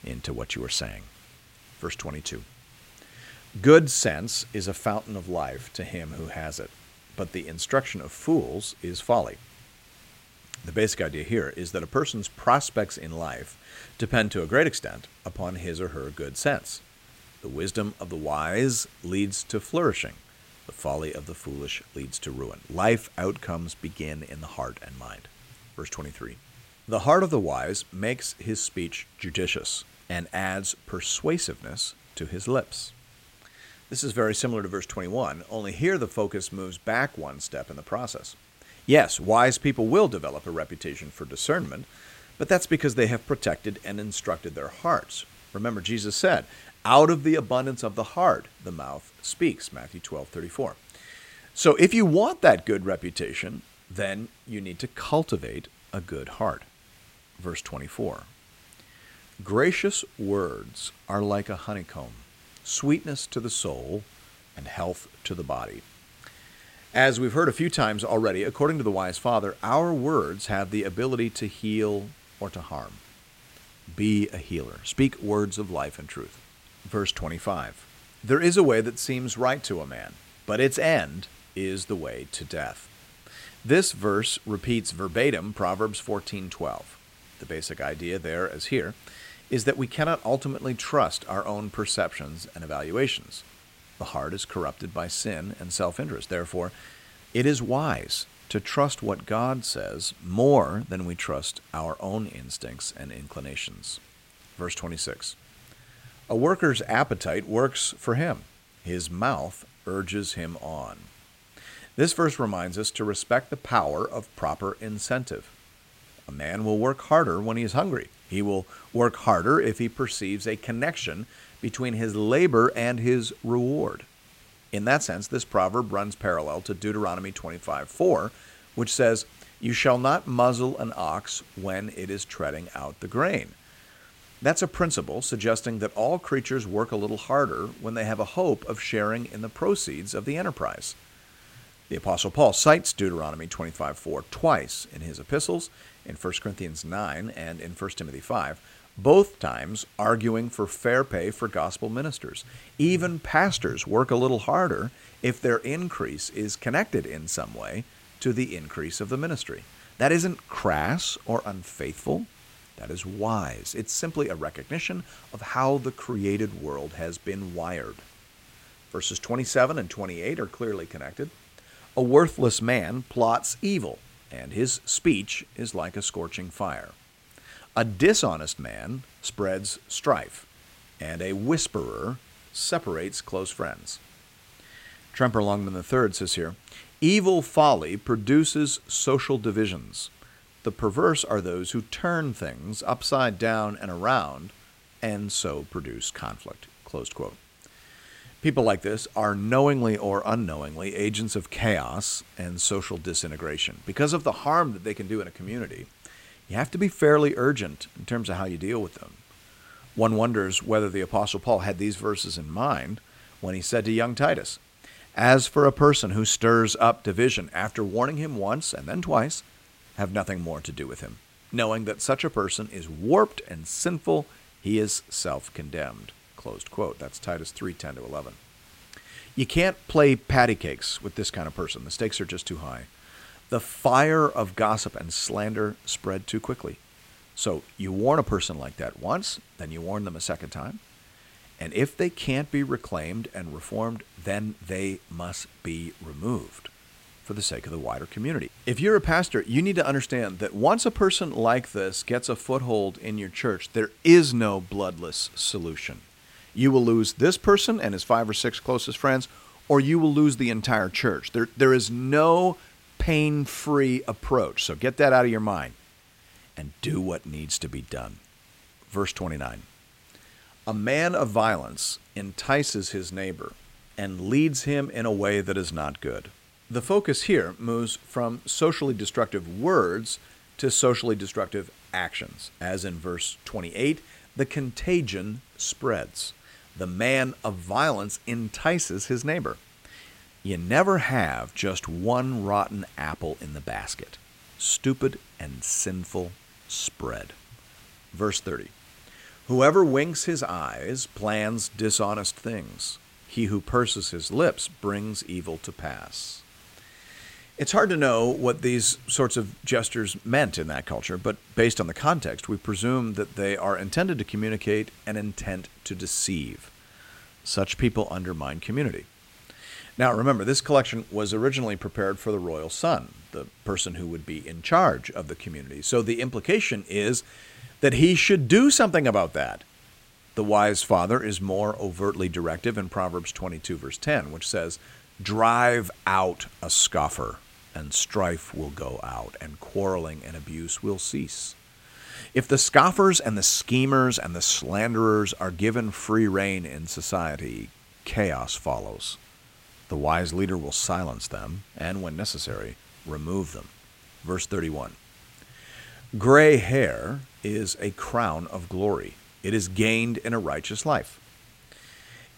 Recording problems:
hiss; faint; throughout; 25 dB below the speech

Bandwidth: 16 kHz